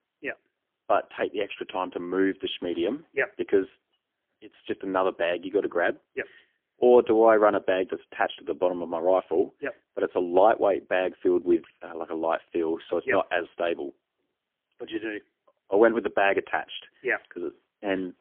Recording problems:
phone-call audio; poor line; nothing above 3.5 kHz

